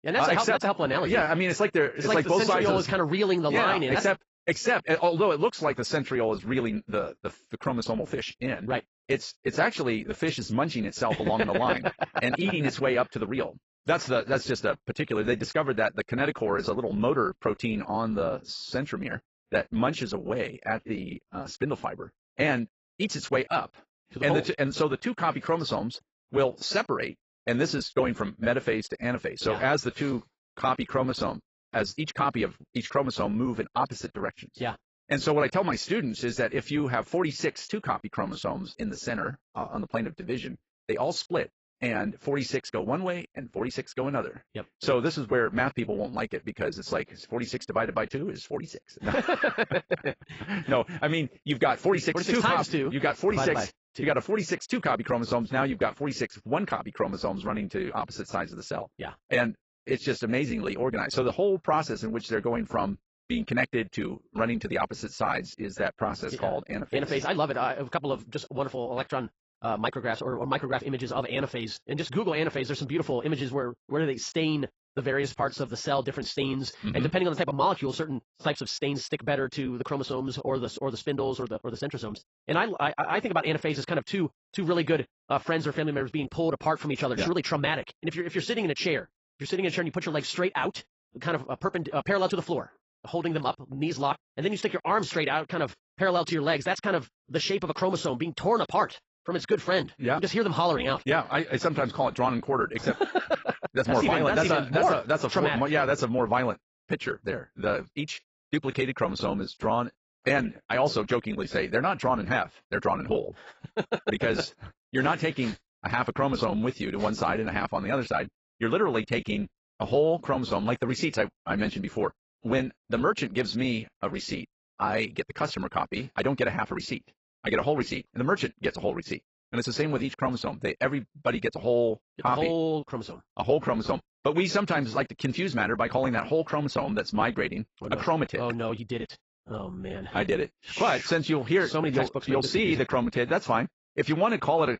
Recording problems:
garbled, watery; badly; nothing above 7.5 kHz
wrong speed, natural pitch; too fast; 1.5 times normal speed

